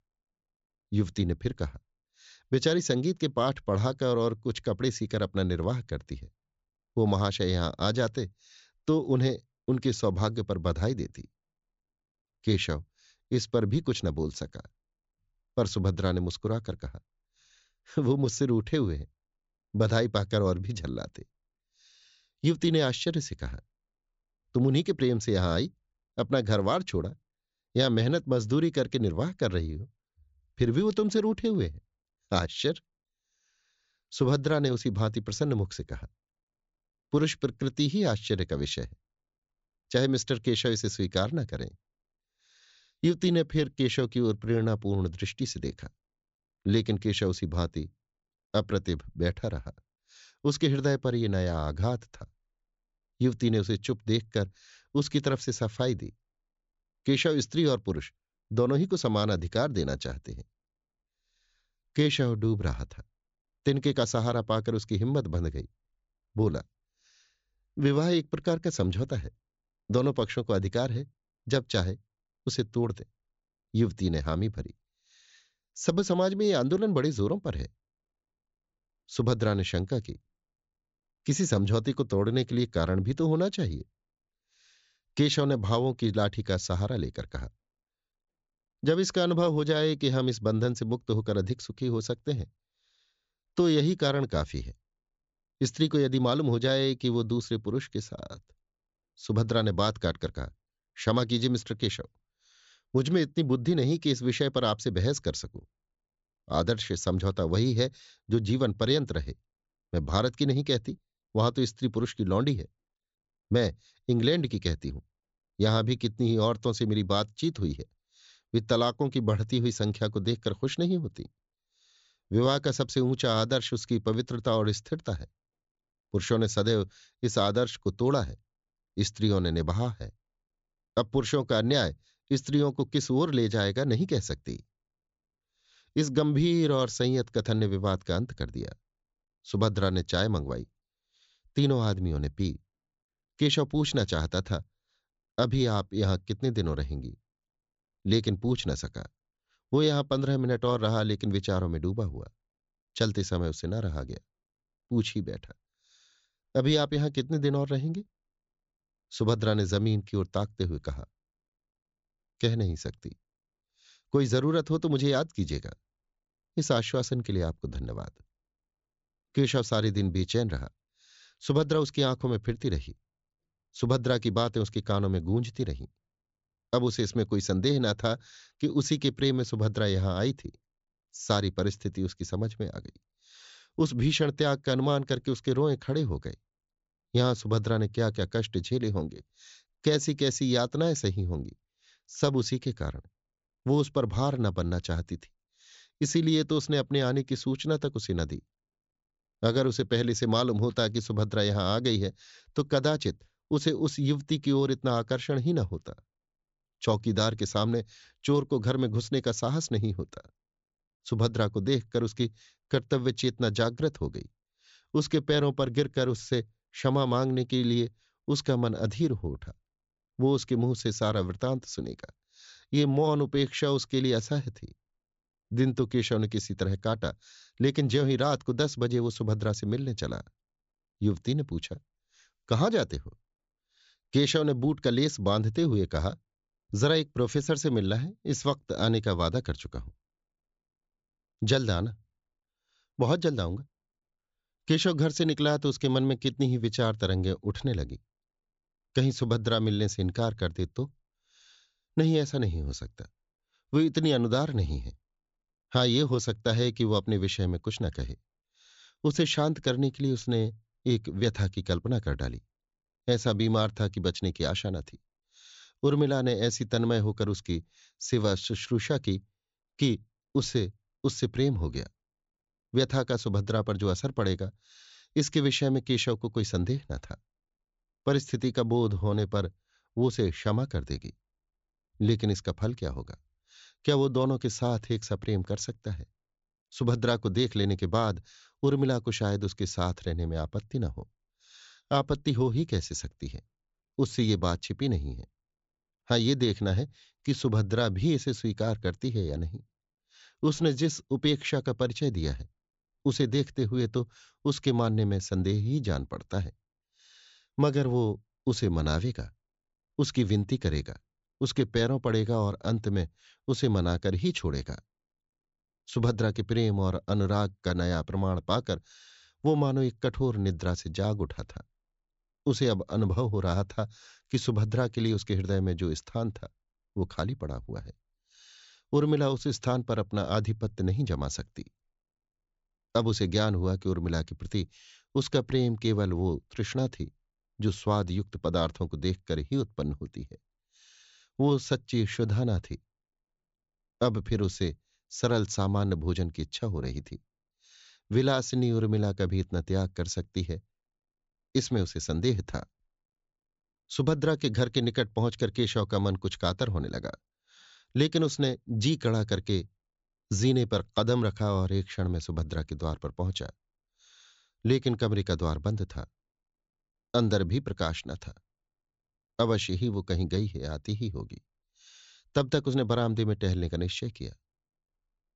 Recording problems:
high frequencies cut off; noticeable; nothing above 8 kHz

